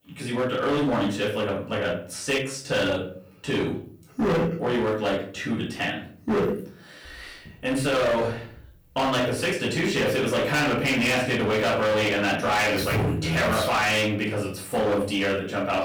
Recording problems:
distortion; heavy; 18% of the sound clipped
off-mic speech; far
room echo; noticeable; dies away in 0.4 s

